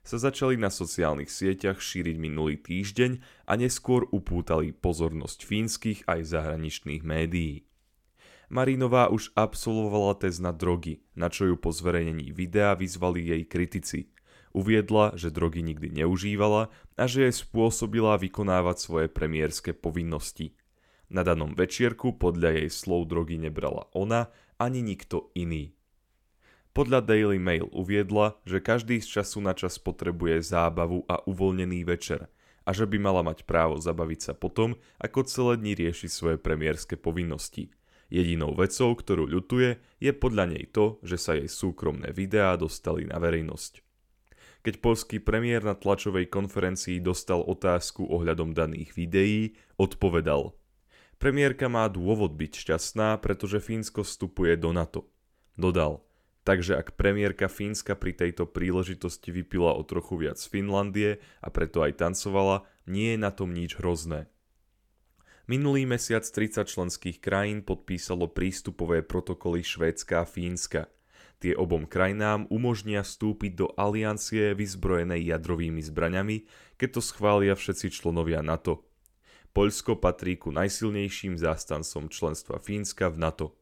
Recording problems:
none

